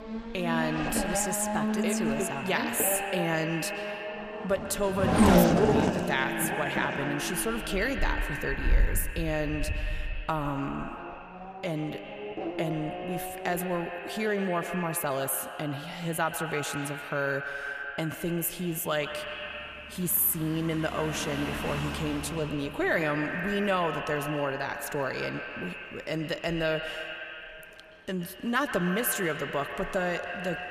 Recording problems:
echo of what is said; strong; throughout; 120 ms later, 7 dB below the speech
traffic noise; loud; throughout; 1 dB below the speech

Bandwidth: 14.5 kHz